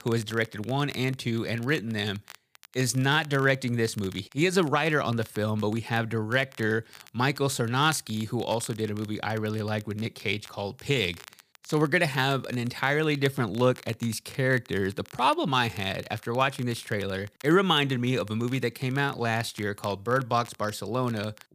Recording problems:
crackle, like an old record; faint; 25 dB below the speech

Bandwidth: 15 kHz